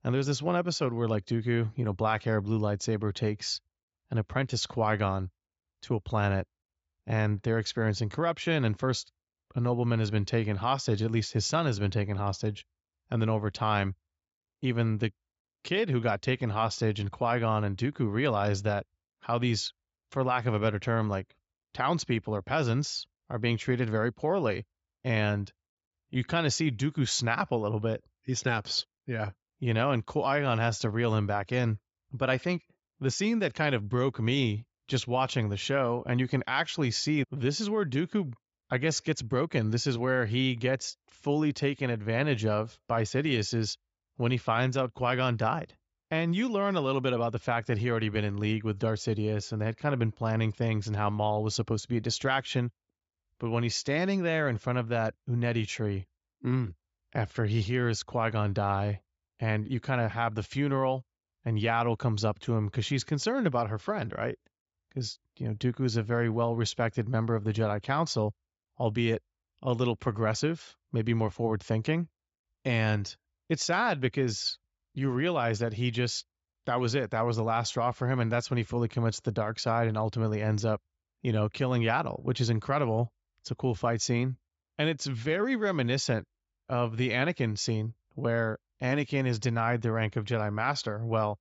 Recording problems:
high frequencies cut off; noticeable; nothing above 8 kHz

